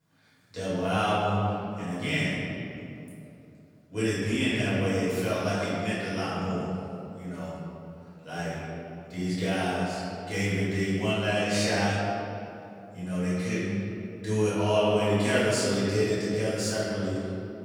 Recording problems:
room echo; strong; dies away in 2.6 s
off-mic speech; far

